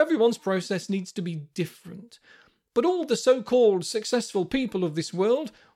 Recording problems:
abrupt cut into speech; at the start

